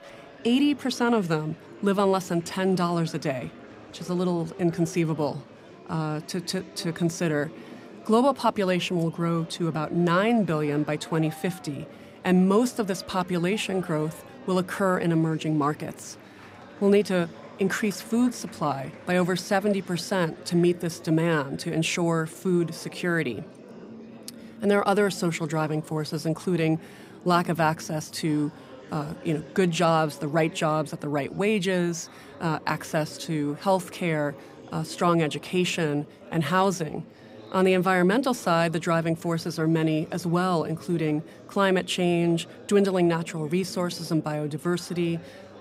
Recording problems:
murmuring crowd; noticeable; throughout; 20 dB below the speech

